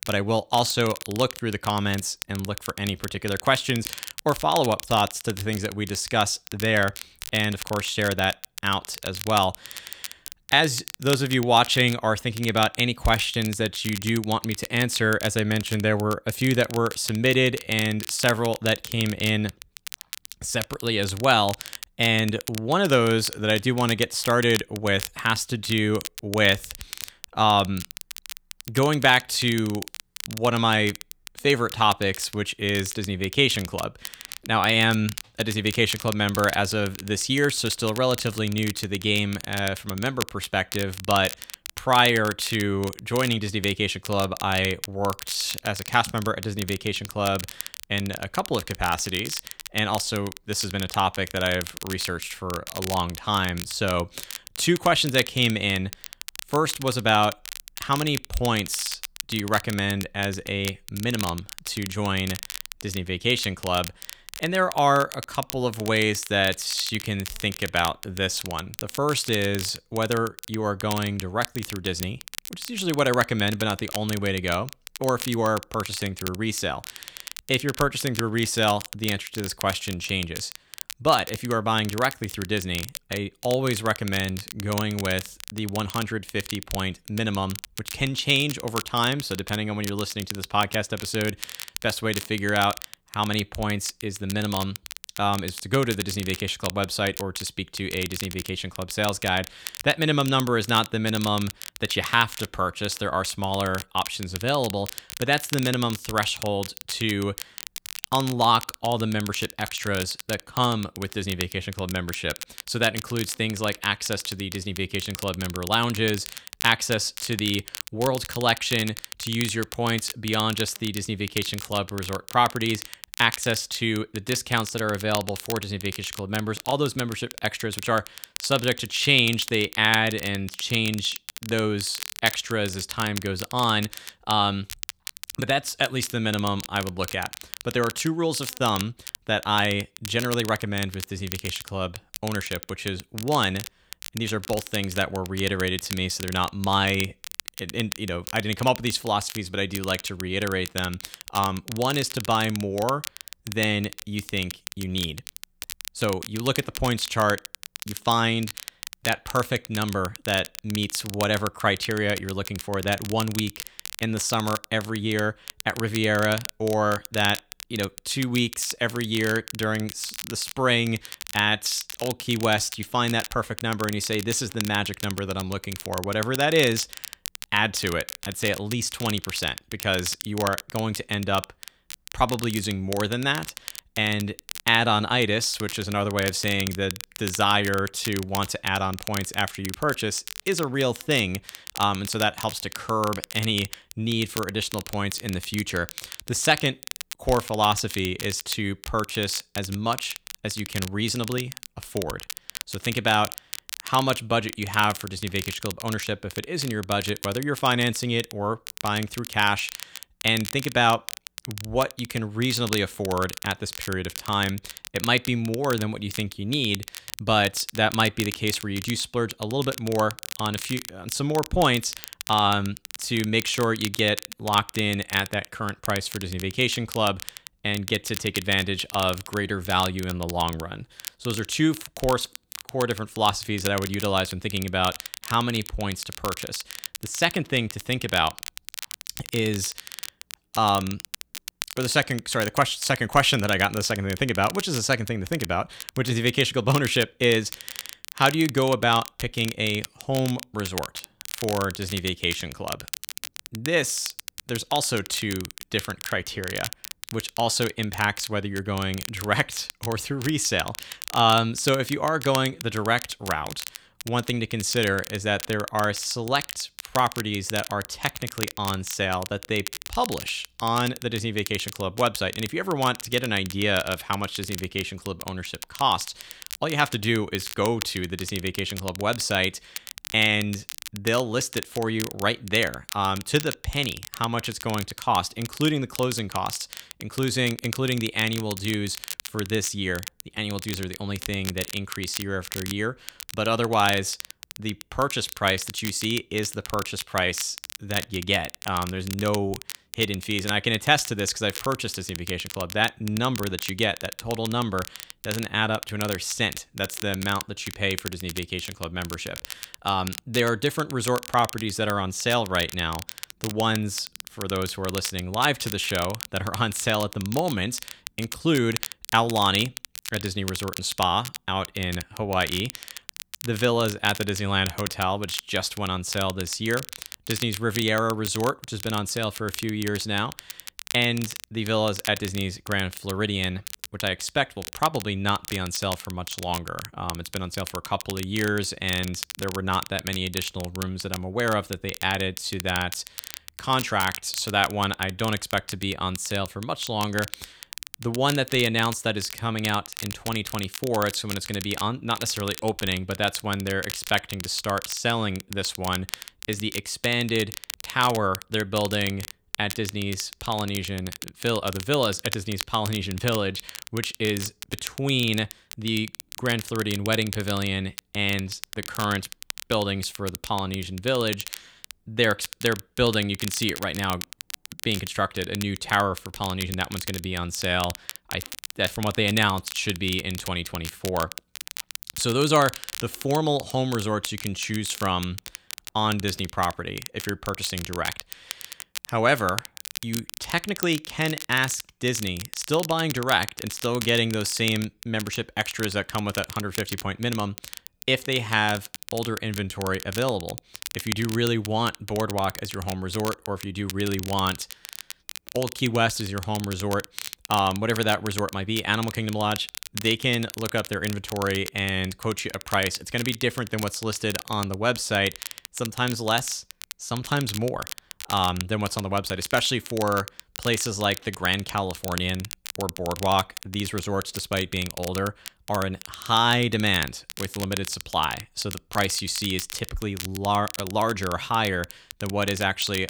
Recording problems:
crackle, like an old record; noticeable; 10 dB below the speech

